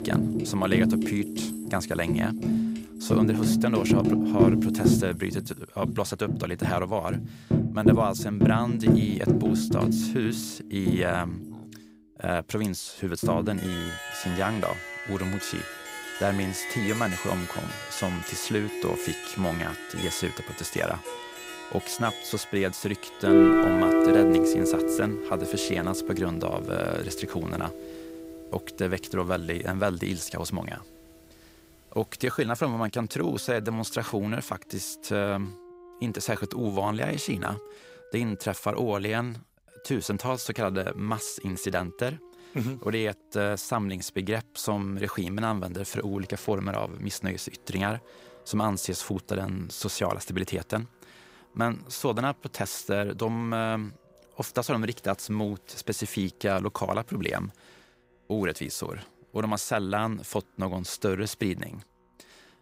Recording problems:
background music; very loud; throughout; 3 dB above the speech

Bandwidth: 15.5 kHz